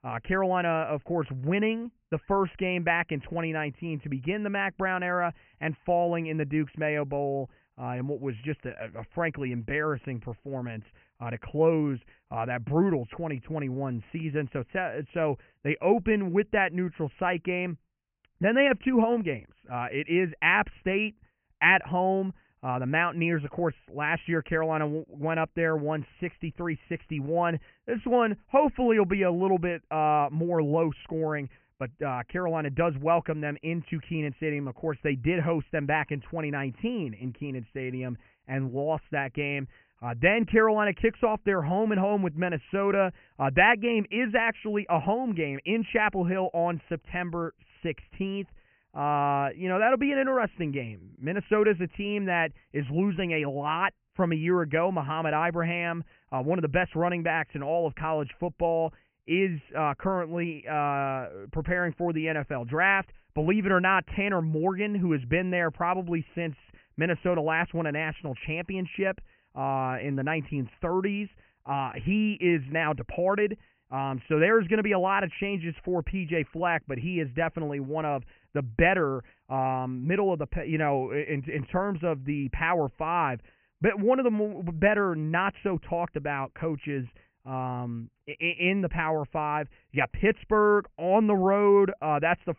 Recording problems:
high frequencies cut off; severe; nothing above 3 kHz

